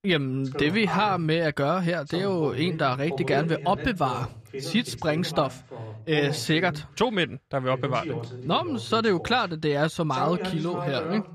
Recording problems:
voice in the background; loud; throughout; 10 dB below the speech

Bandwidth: 14 kHz